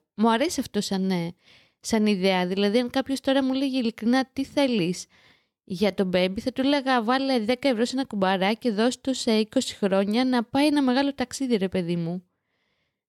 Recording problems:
none

